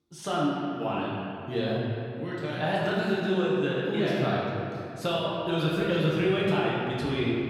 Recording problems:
room echo; strong; dies away in 2.5 s
off-mic speech; far

